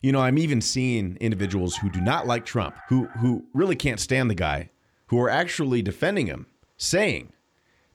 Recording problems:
animal sounds; noticeable; throughout; 20 dB below the speech

